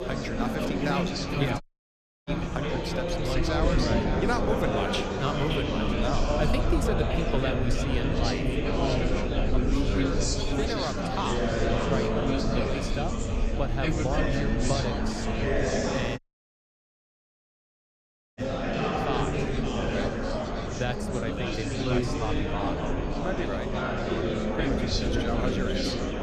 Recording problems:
echo of what is said; strong; throughout; 570 ms later, 7 dB below the speech
chatter from many people; very loud; throughout; 5 dB above the speech
low rumble; noticeable; throughout; 20 dB below the speech
high-pitched whine; faint; throughout; 6.5 kHz, 30 dB below the speech
audio cutting out; at 1.5 s for 0.5 s and at 16 s for 2 s

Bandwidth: 14.5 kHz